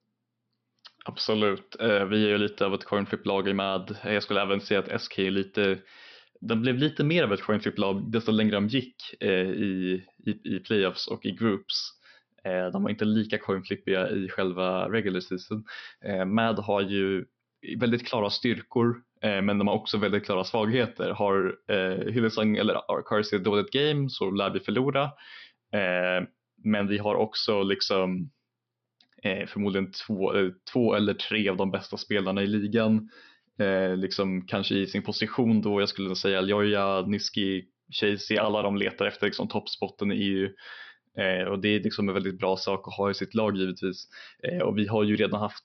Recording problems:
high frequencies cut off; noticeable; nothing above 5.5 kHz

